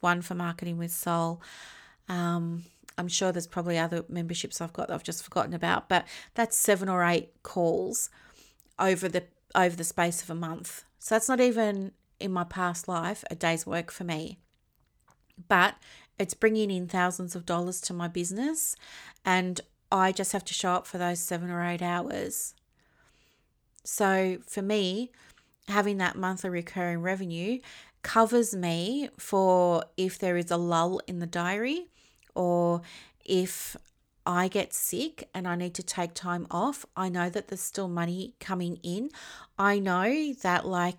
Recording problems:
none

